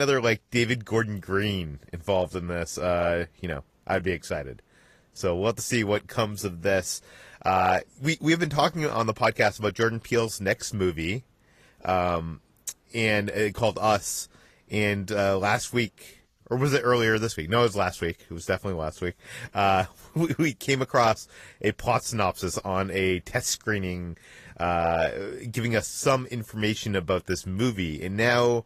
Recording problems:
garbled, watery; slightly; nothing above 15 kHz
abrupt cut into speech; at the start

